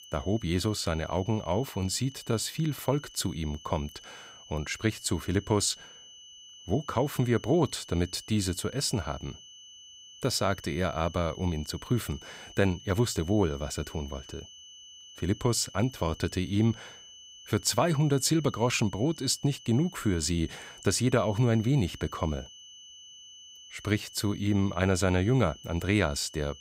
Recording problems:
high-pitched whine; noticeable; throughout; 3 kHz, 20 dB below the speech

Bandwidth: 15.5 kHz